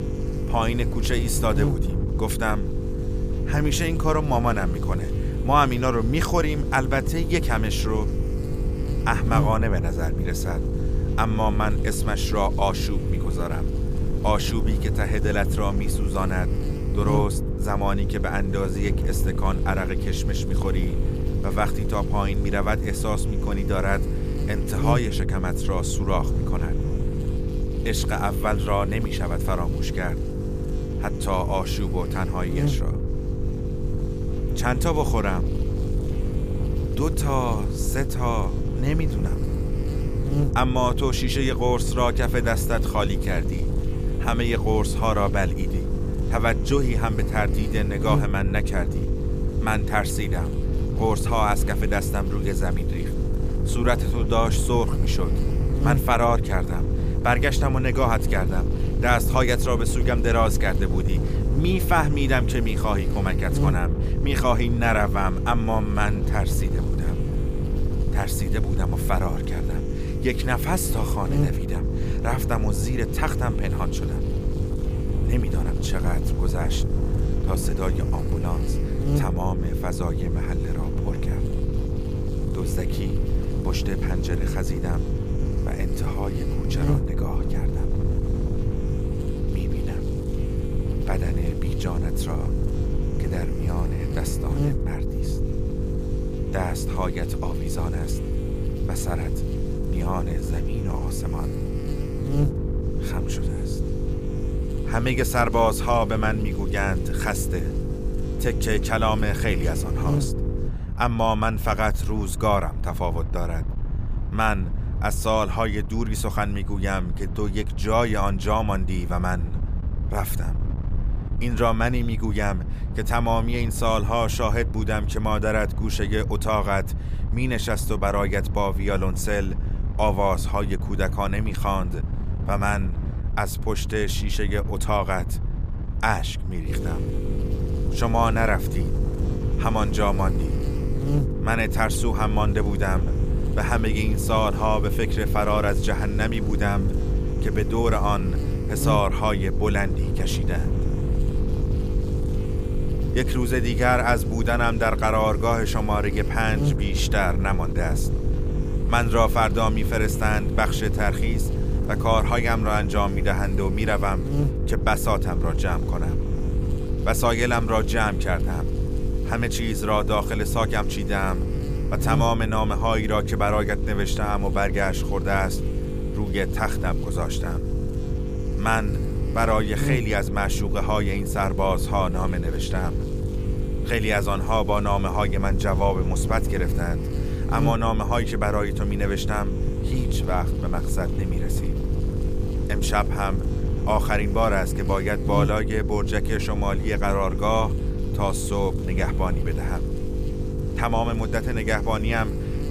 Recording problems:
electrical hum; loud; until 1:51 and from 2:17 on; 50 Hz, 10 dB below the speech
wind noise on the microphone; occasional gusts; 15 dB below the speech

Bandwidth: 15 kHz